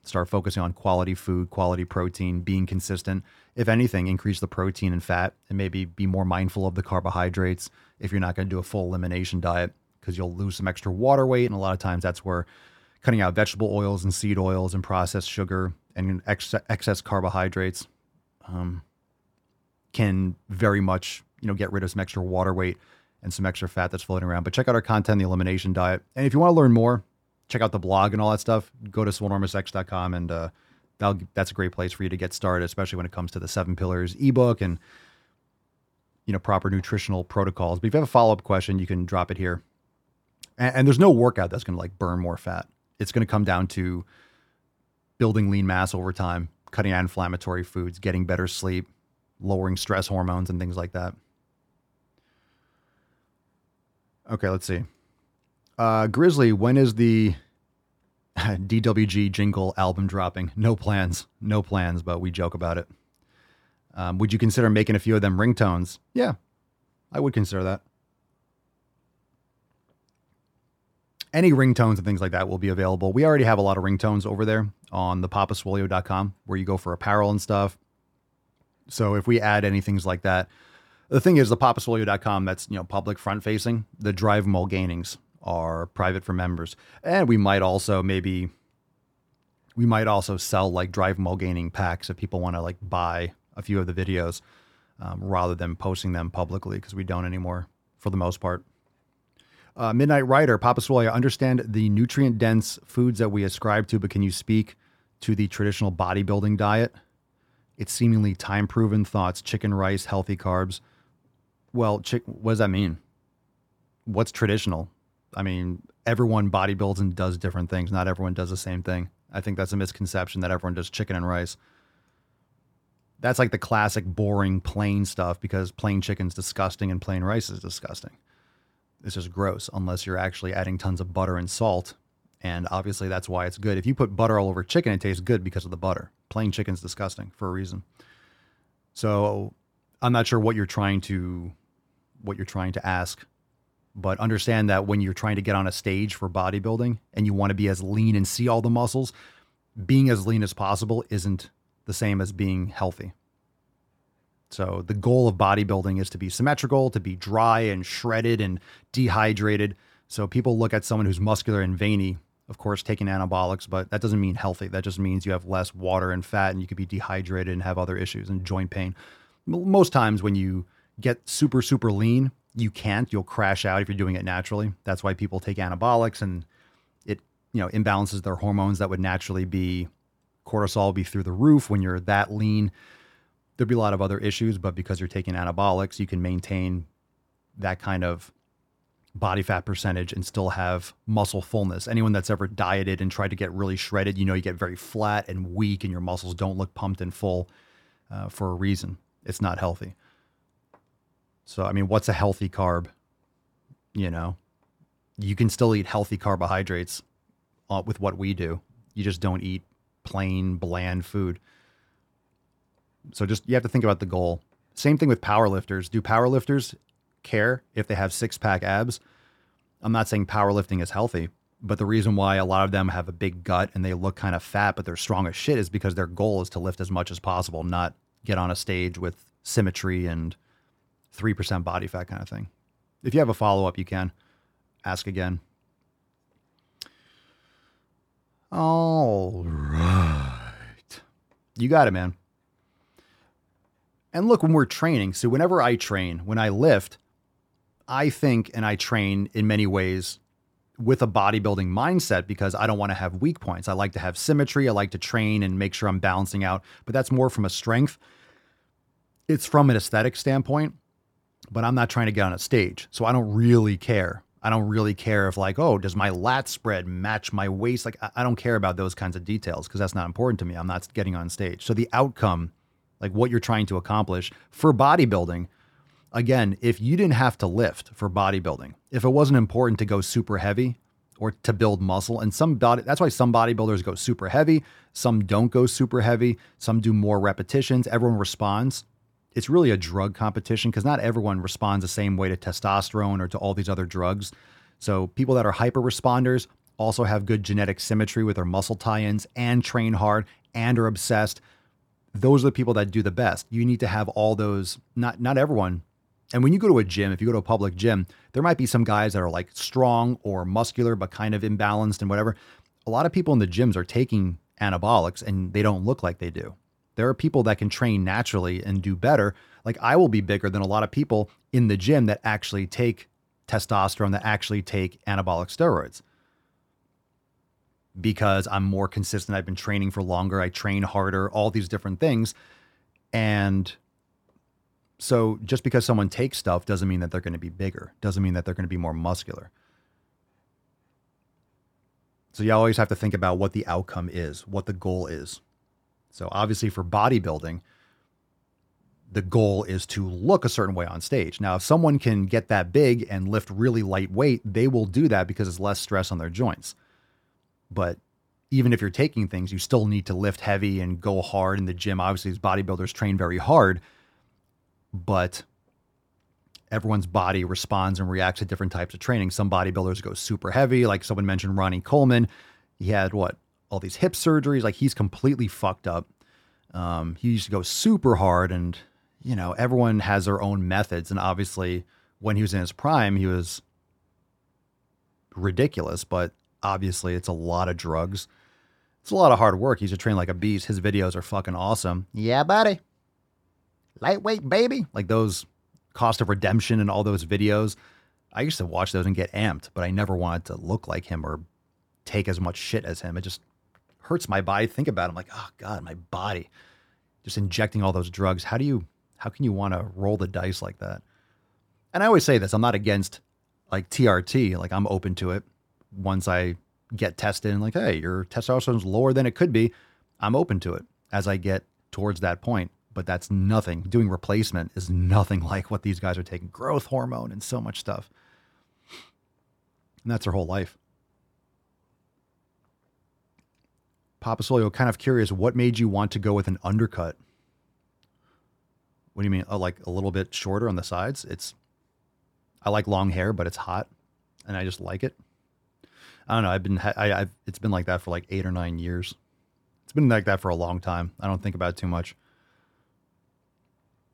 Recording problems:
none

